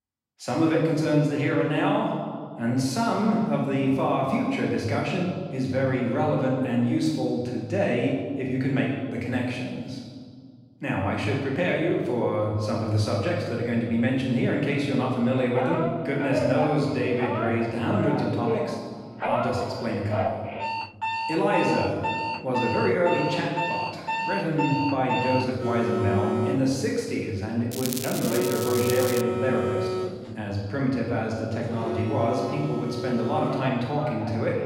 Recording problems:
off-mic speech; far
room echo; noticeable; dies away in 1.5 s
alarms or sirens; loud; from 15 s on; 5 dB below the speech
crackling; loud; from 28 to 29 s; 7 dB below the speech

